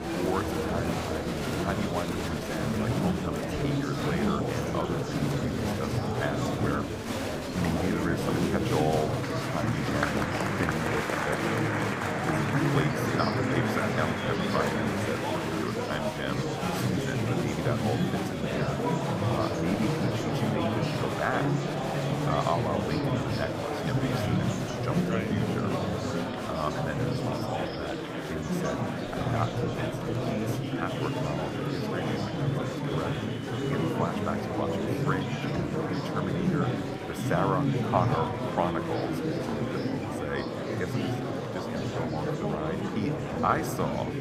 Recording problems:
murmuring crowd; very loud; throughout; 5 dB above the speech

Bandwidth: 15.5 kHz